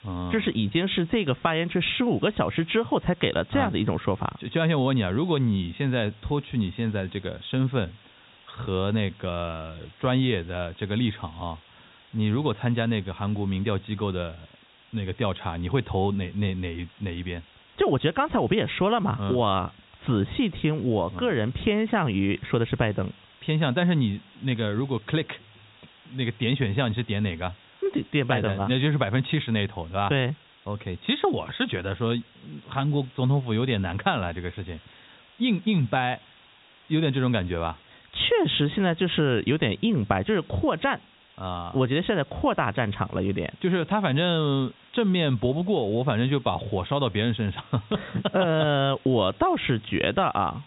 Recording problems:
high frequencies cut off; severe; nothing above 4 kHz
hiss; faint; throughout; 25 dB below the speech

